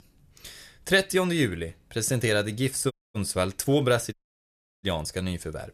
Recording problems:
audio cutting out; at 3 s and at 4 s for 0.5 s

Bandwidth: 14 kHz